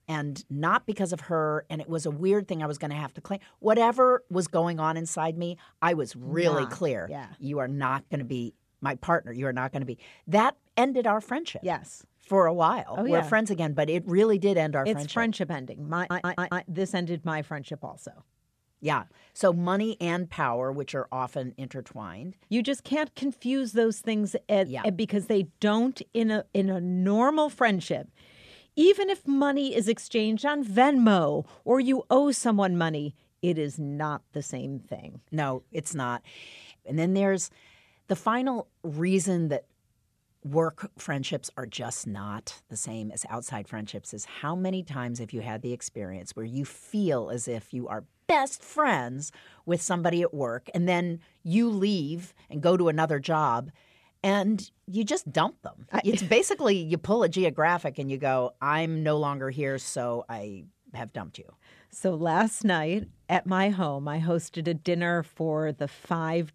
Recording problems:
audio stuttering; at 16 s

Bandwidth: 14.5 kHz